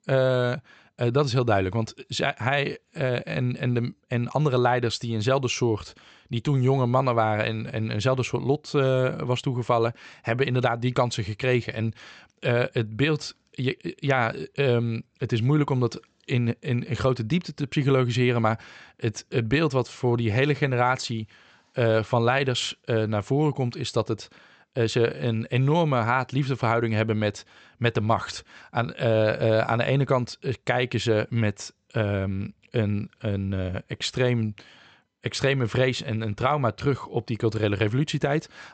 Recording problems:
high frequencies cut off; noticeable; nothing above 8 kHz

